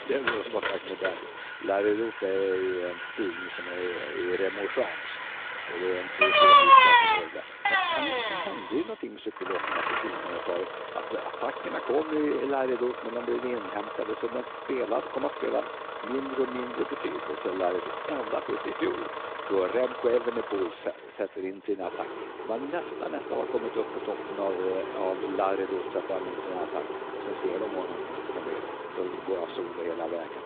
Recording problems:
phone-call audio
traffic noise; very loud; throughout; 3 dB above the speech

